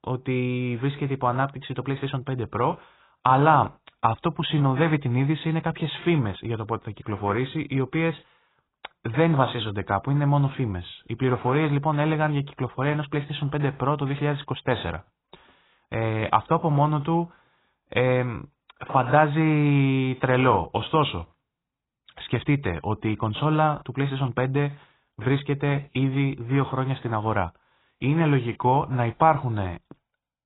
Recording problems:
garbled, watery; badly; nothing above 4 kHz

